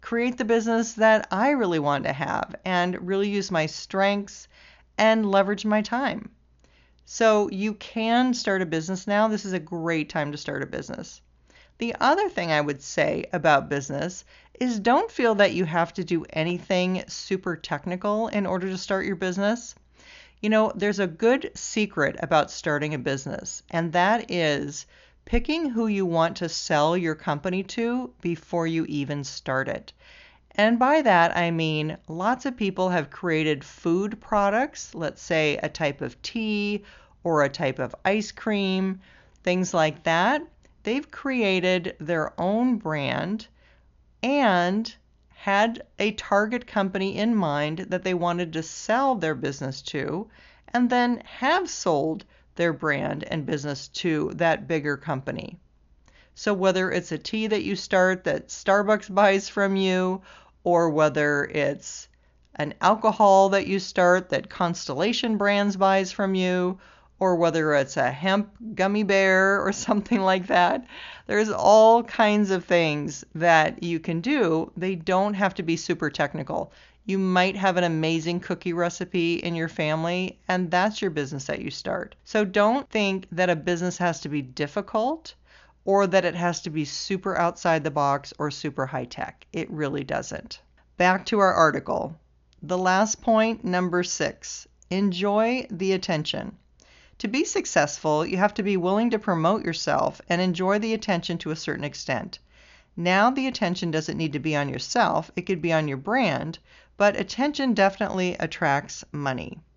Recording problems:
high frequencies cut off; noticeable; nothing above 7 kHz

